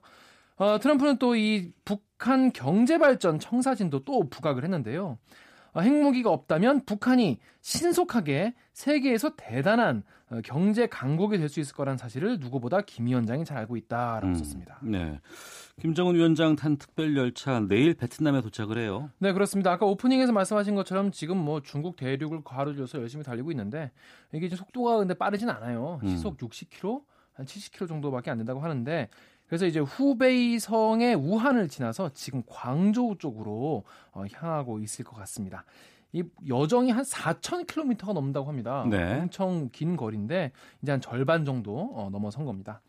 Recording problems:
none

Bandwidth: 15 kHz